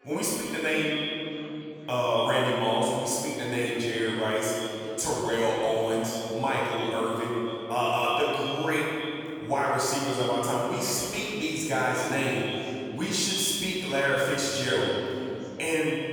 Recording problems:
echo of what is said; strong; throughout; 130 ms later, 10 dB below the speech
room echo; strong; dies away in 2.7 s
off-mic speech; far
chatter from many people; faint; throughout; 25 dB below the speech

